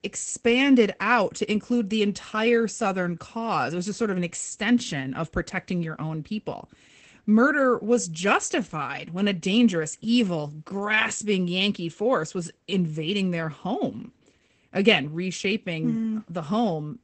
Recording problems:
garbled, watery; badly; nothing above 8 kHz

